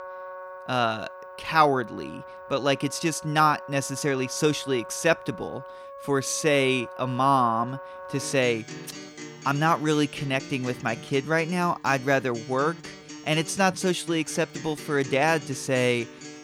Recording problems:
background music; noticeable; throughout; 15 dB below the speech

